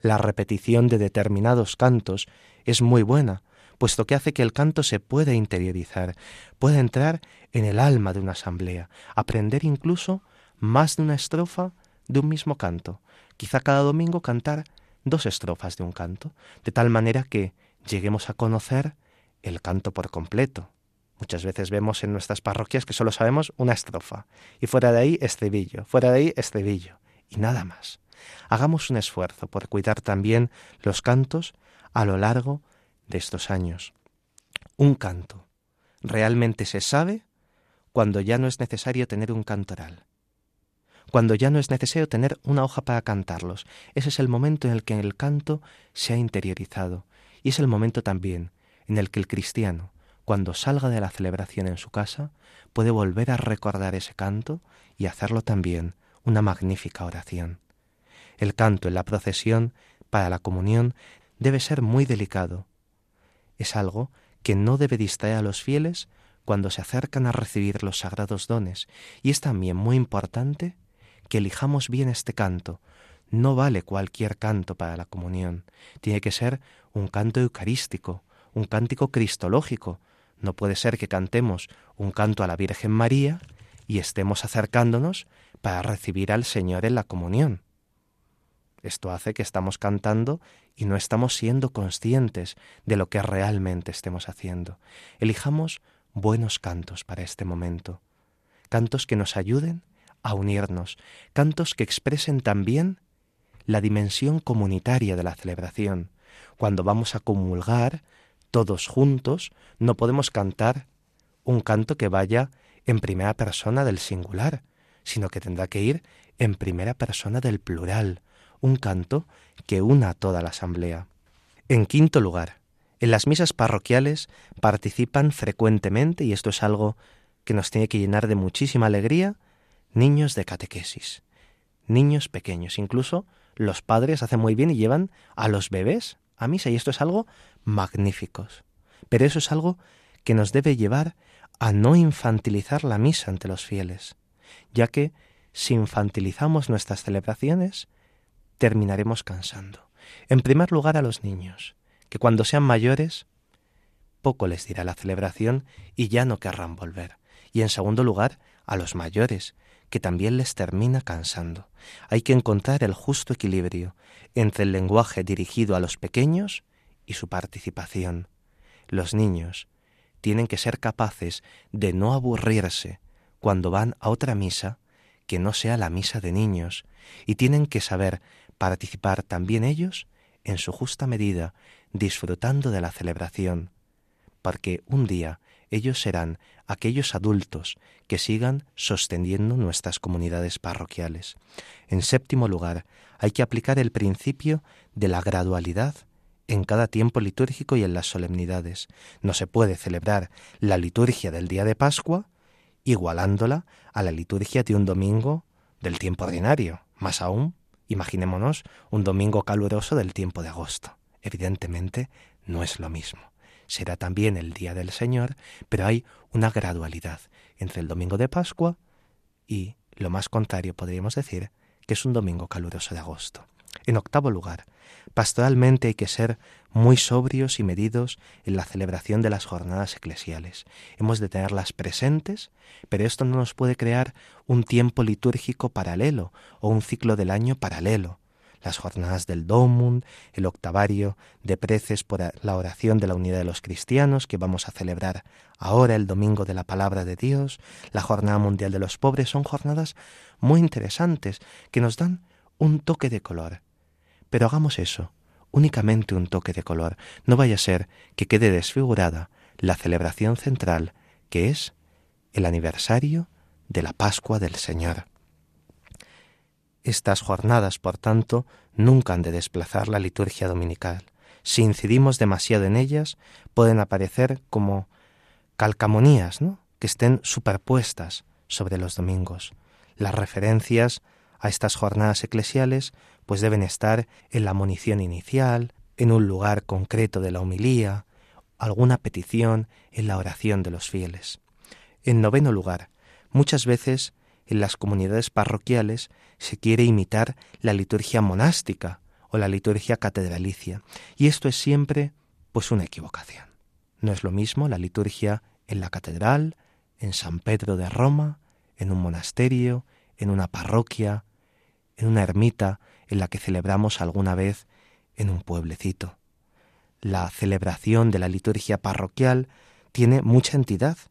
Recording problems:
none

